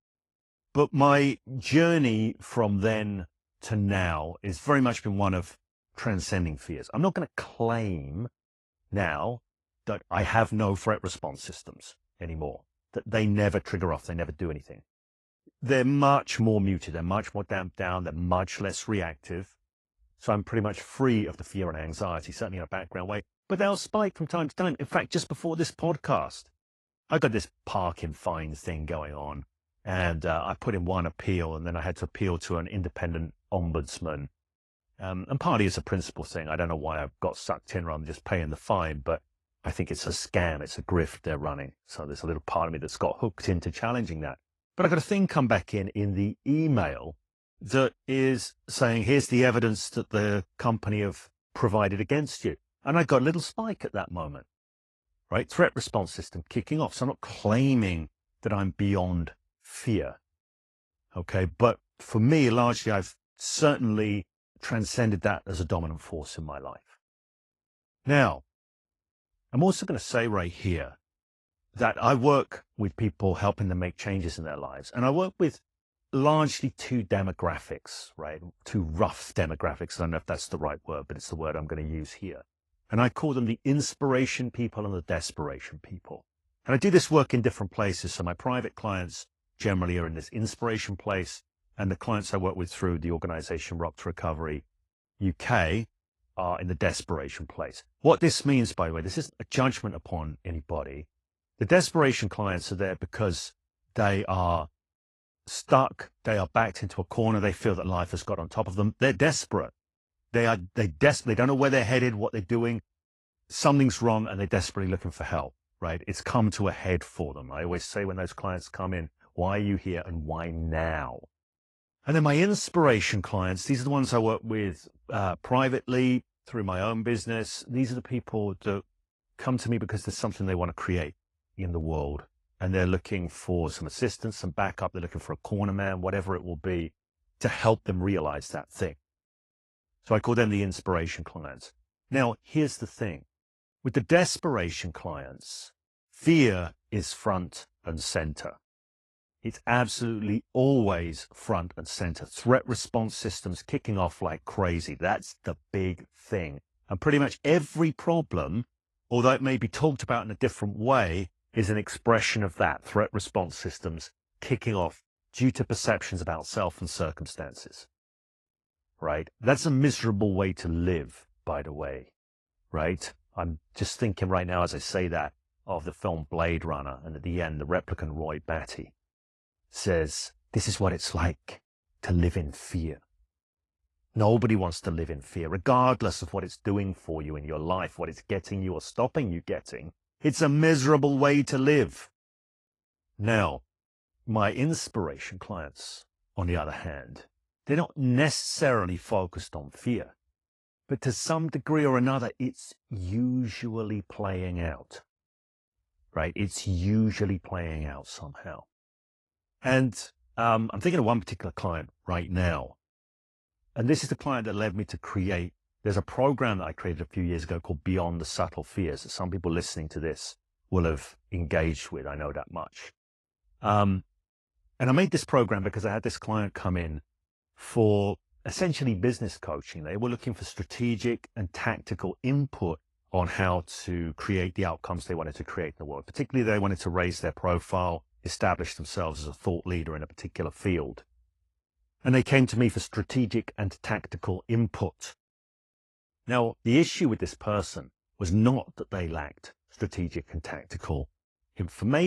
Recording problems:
garbled, watery; slightly; nothing above 11 kHz
abrupt cut into speech; at the end

